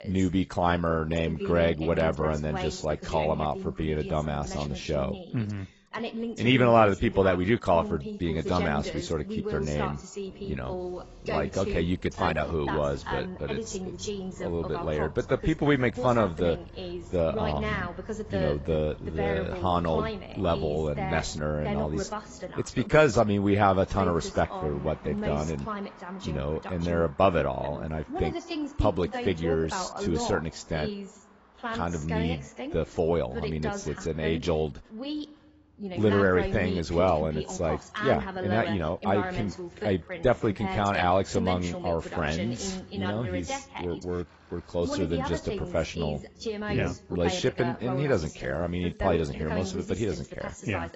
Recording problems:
garbled, watery; badly; nothing above 7.5 kHz
voice in the background; loud; throughout; 8 dB below the speech
traffic noise; faint; throughout; 25 dB below the speech

